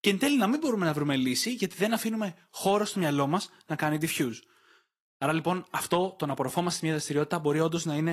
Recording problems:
garbled, watery; slightly
abrupt cut into speech; at the end

